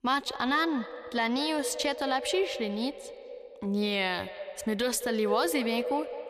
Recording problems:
echo of what is said; strong; throughout; 210 ms later, 9 dB below the speech

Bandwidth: 14.5 kHz